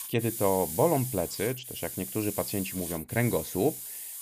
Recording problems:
hiss; loud; throughout; 6 dB below the speech

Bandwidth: 15 kHz